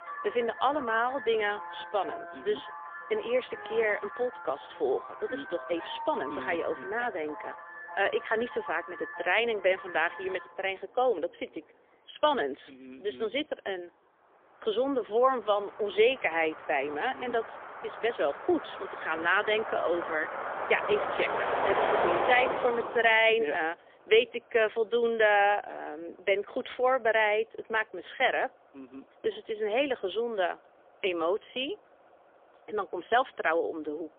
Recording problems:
phone-call audio; poor line; nothing above 3.5 kHz
traffic noise; loud; throughout; 7 dB below the speech

